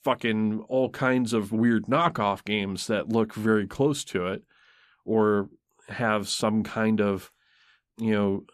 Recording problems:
none

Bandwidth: 14.5 kHz